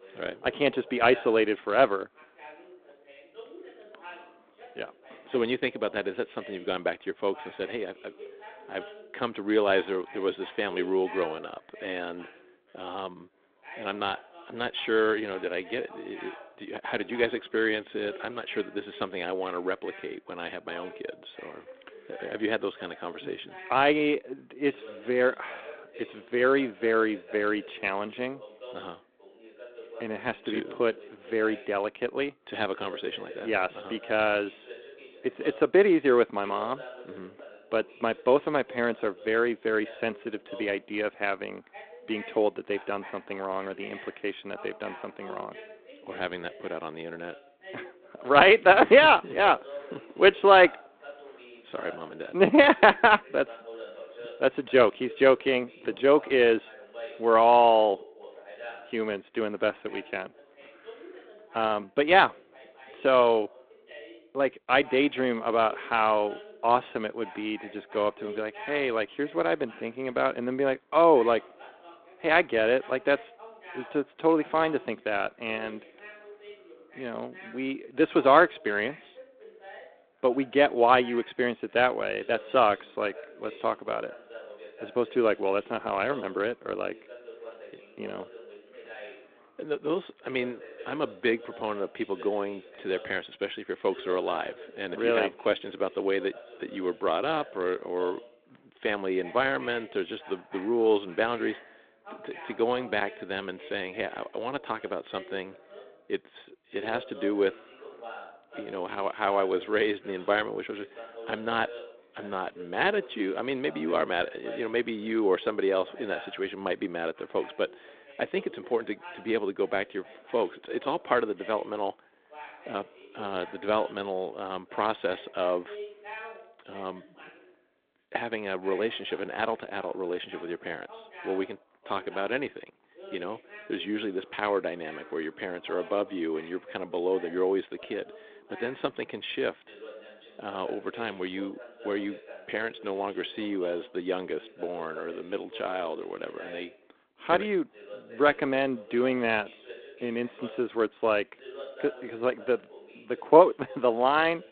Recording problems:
phone-call audio; nothing above 3.5 kHz
background chatter; noticeable; throughout; 2 voices, 20 dB below the speech

